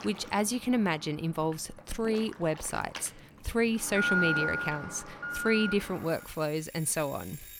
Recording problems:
alarms or sirens; loud; throughout; 3 dB below the speech

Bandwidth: 17.5 kHz